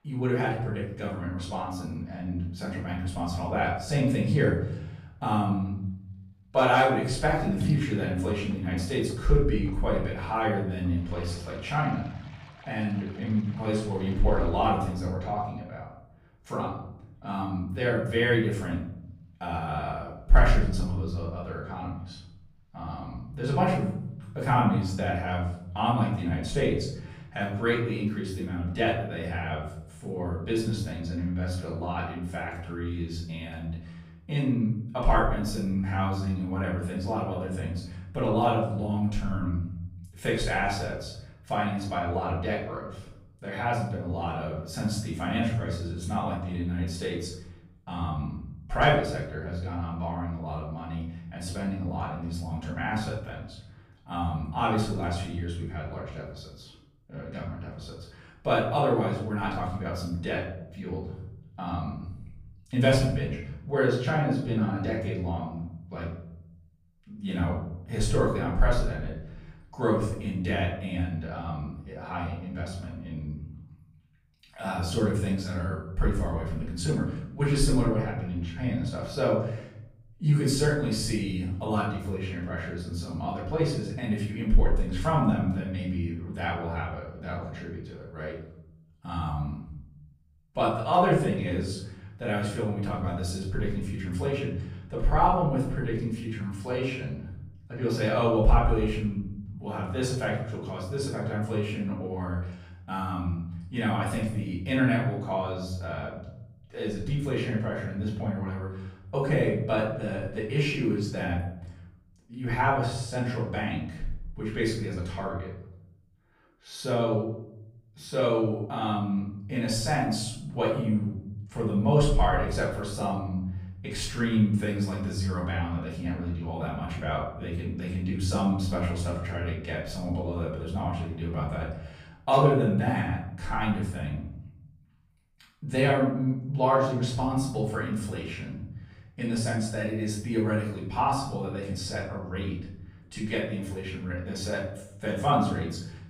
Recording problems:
off-mic speech; far
room echo; noticeable; dies away in 0.8 s
rain or running water; very faint; until 32 s; 15 dB below the speech

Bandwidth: 15.5 kHz